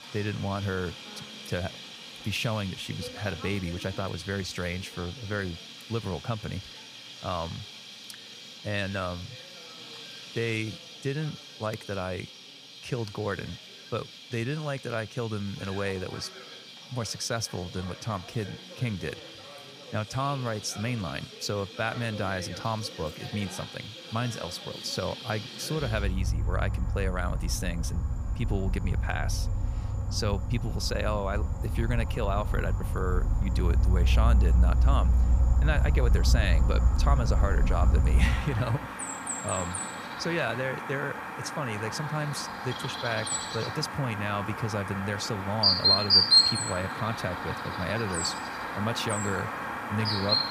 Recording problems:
animal sounds; very loud; throughout; 4 dB above the speech

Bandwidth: 15 kHz